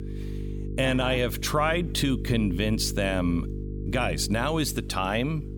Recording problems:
electrical hum; noticeable; throughout; 50 Hz, 15 dB below the speech

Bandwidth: 18 kHz